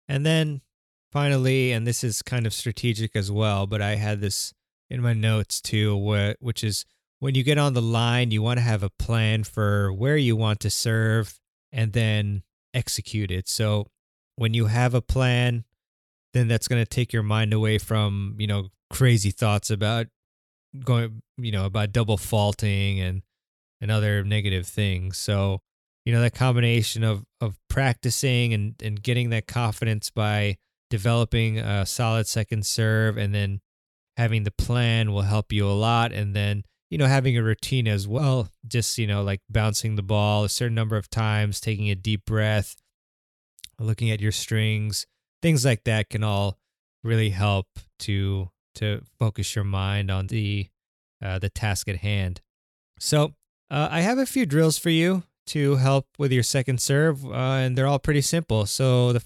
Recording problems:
none

